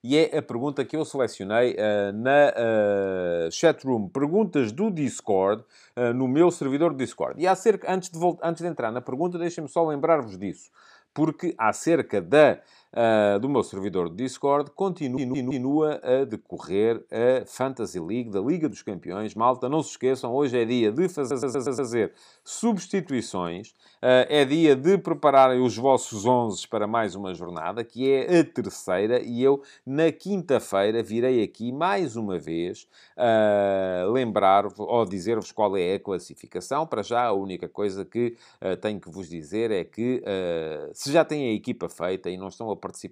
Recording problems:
audio stuttering; at 15 s and at 21 s

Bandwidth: 15 kHz